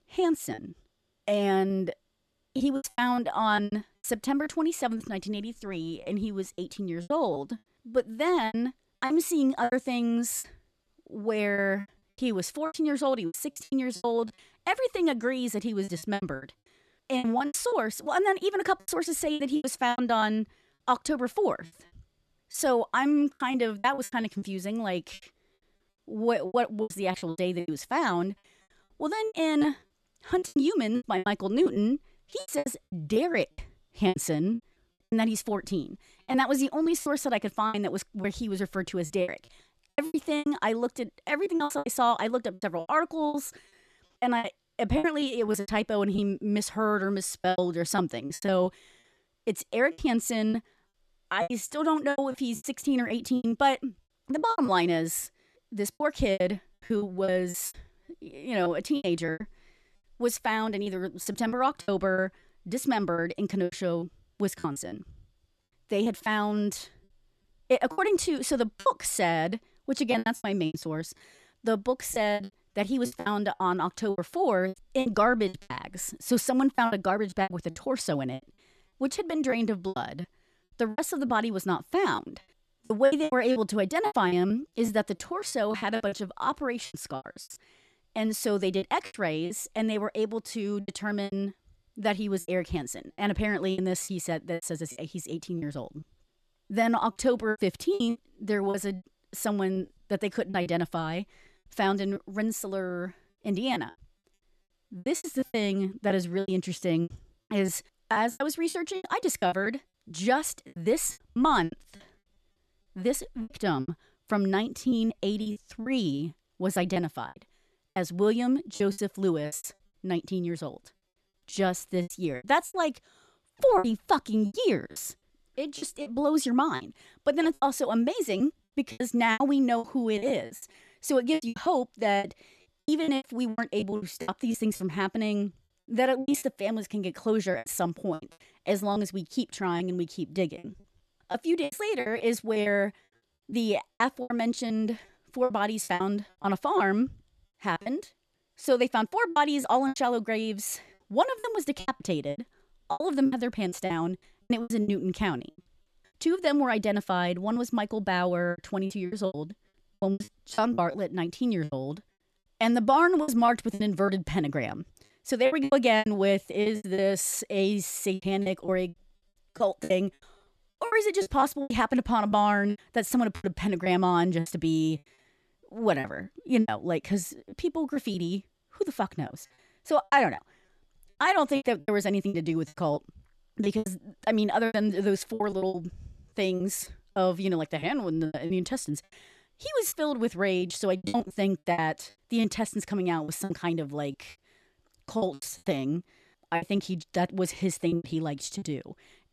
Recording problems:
choppy; very; 14% of the speech affected

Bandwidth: 13.5 kHz